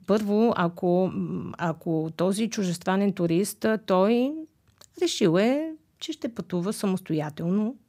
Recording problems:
none

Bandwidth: 15.5 kHz